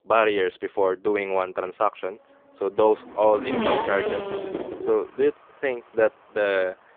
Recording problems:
phone-call audio; poor line
traffic noise; loud; throughout; 4 dB below the speech

